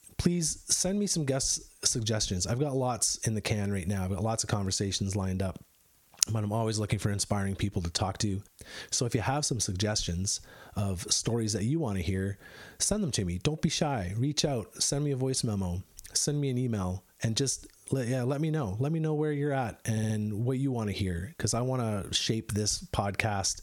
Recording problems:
squashed, flat; heavily
audio stuttering; at 20 s

